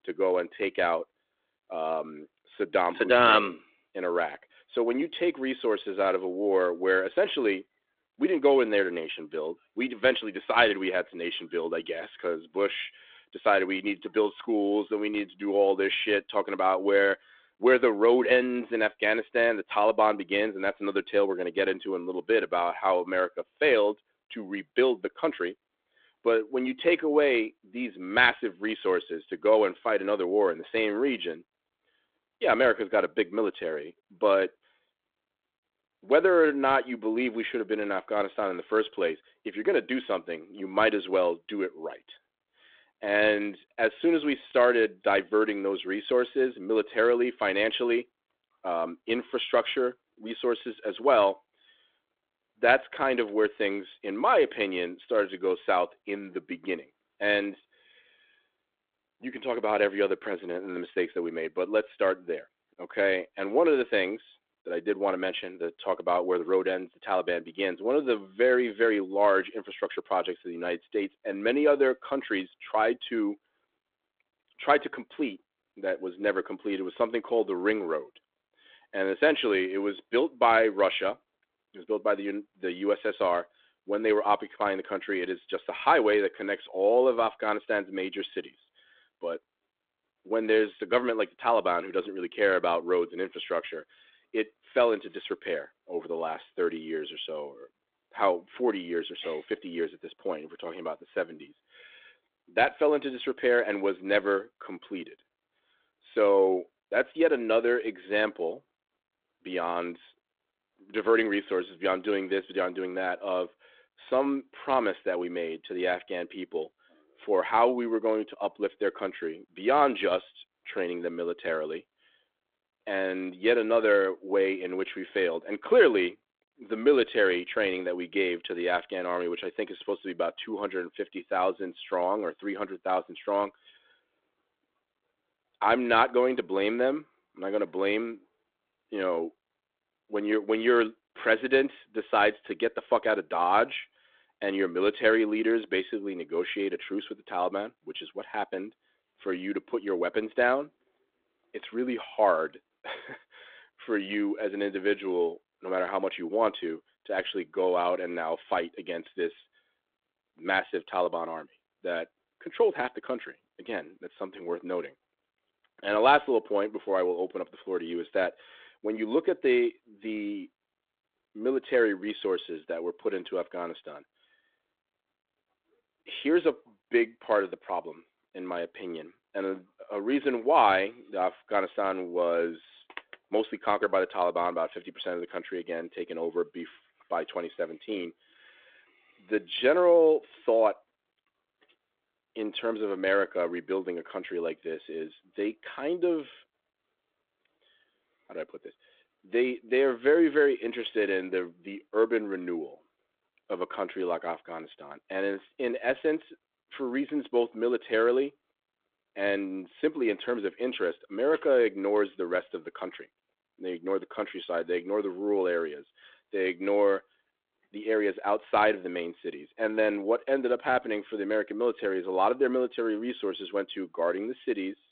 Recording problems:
phone-call audio

